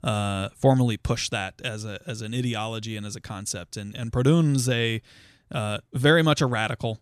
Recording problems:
none

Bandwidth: 14 kHz